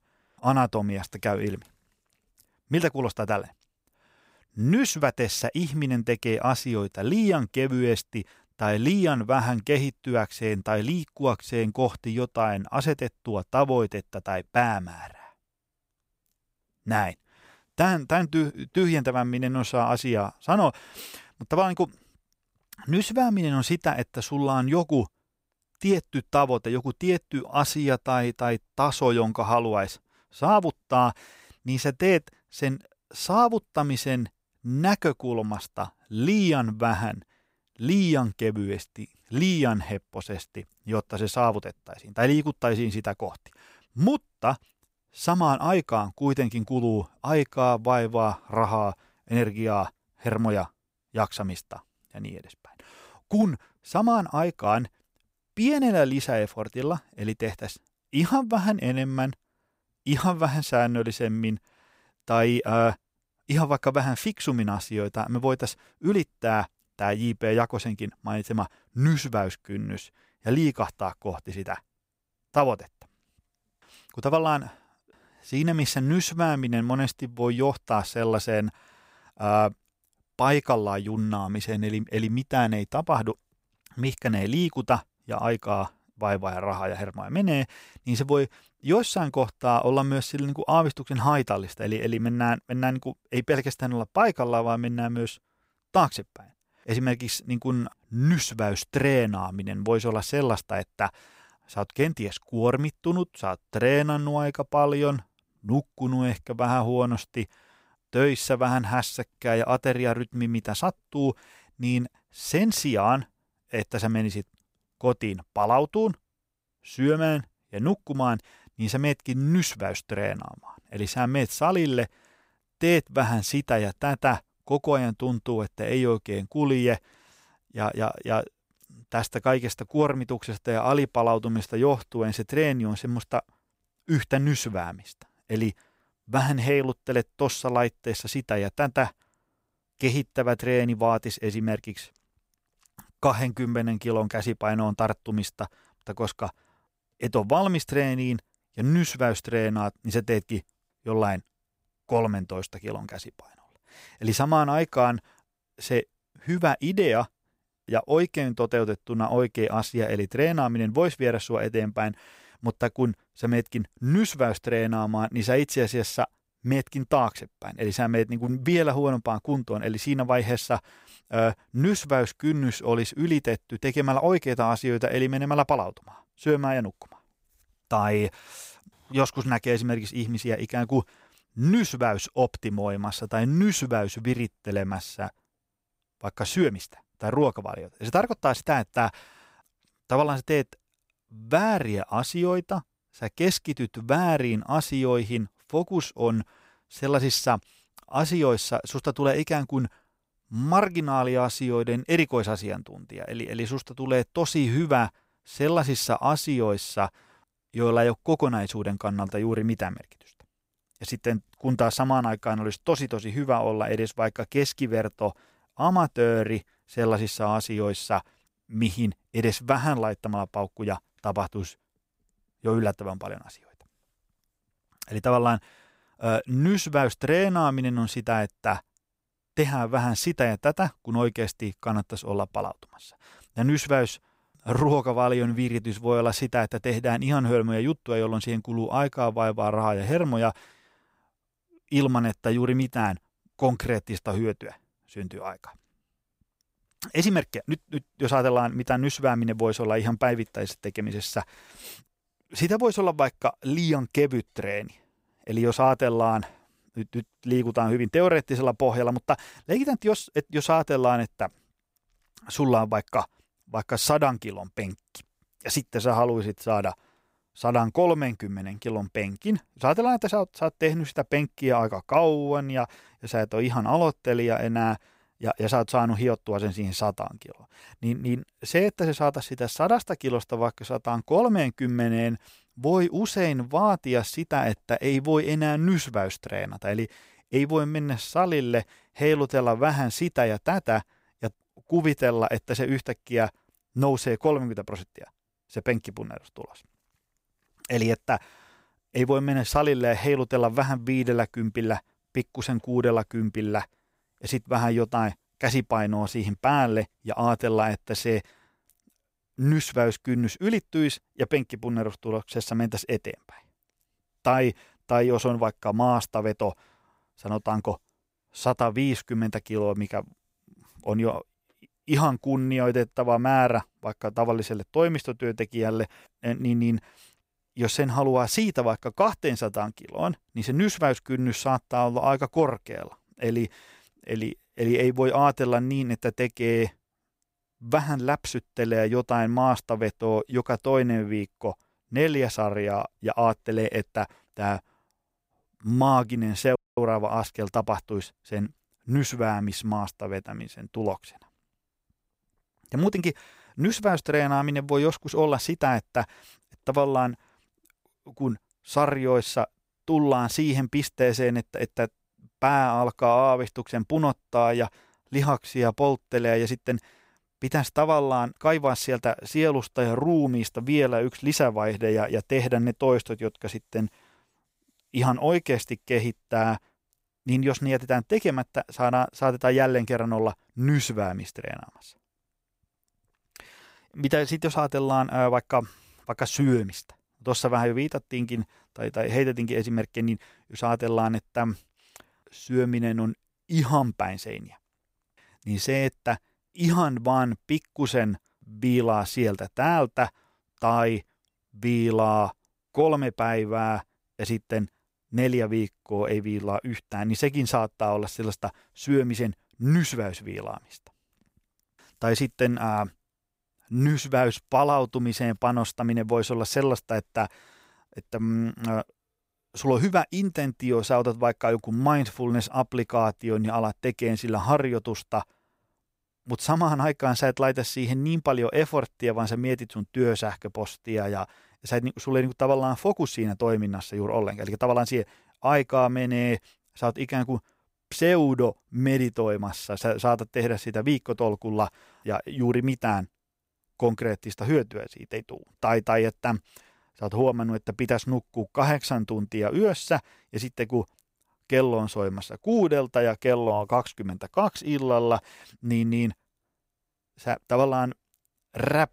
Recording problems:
audio cutting out; at 5:47

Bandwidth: 15.5 kHz